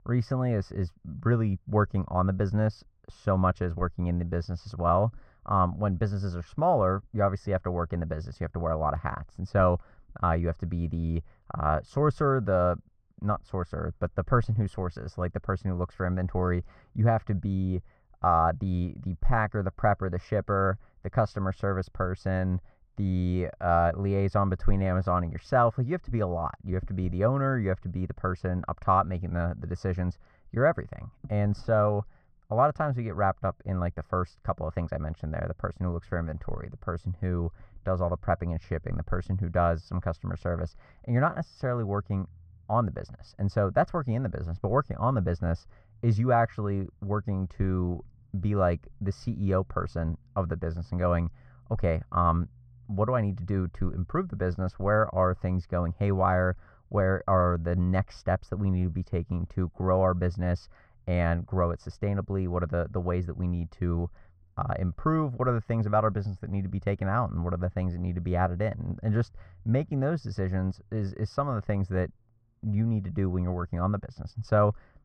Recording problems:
muffled; very; fading above 1 kHz

